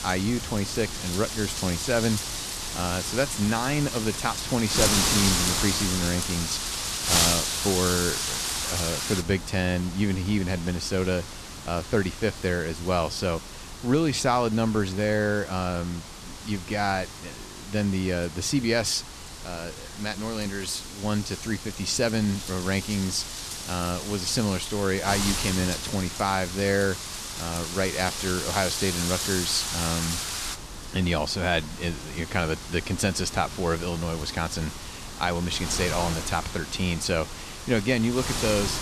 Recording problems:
wind noise on the microphone; heavy; 3 dB below the speech

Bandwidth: 14 kHz